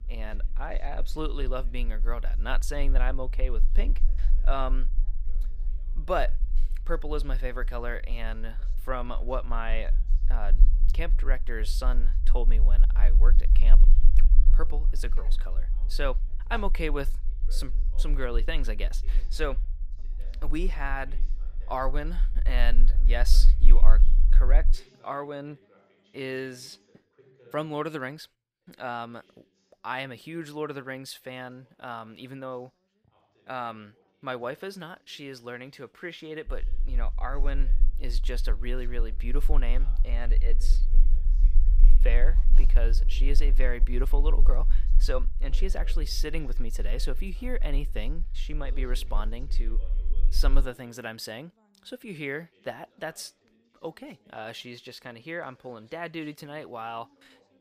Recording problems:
low rumble; noticeable; until 25 s and from 36 to 51 s; 20 dB below the speech
background chatter; faint; throughout; 2 voices, 25 dB below the speech

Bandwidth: 15 kHz